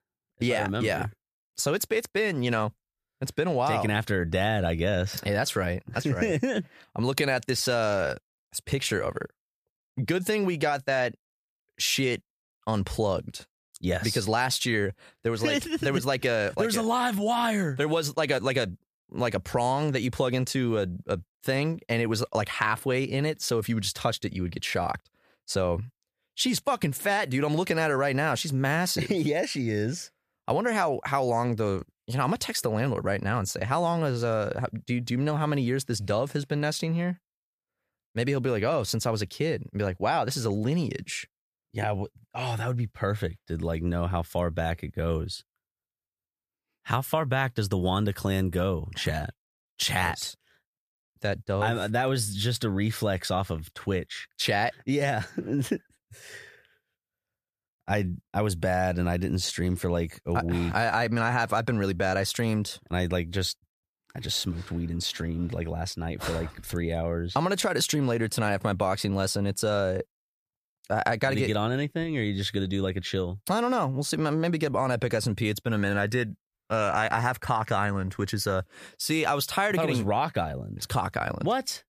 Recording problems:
none

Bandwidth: 14.5 kHz